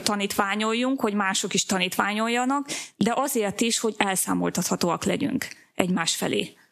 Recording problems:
squashed, flat; somewhat

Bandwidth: 14.5 kHz